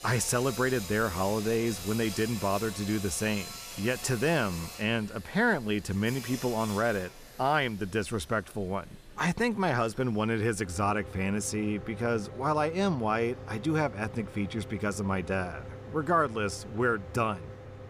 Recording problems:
machinery noise; noticeable; throughout; 10 dB below the speech
murmuring crowd; faint; throughout; 25 dB below the speech

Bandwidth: 15 kHz